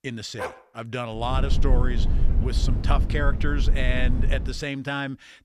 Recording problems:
low rumble; noticeable; from 1.5 to 4.5 s; 10 dB below the speech
dog barking; noticeable; at 0.5 s and at 1.5 s; peak level with the speech

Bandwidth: 14.5 kHz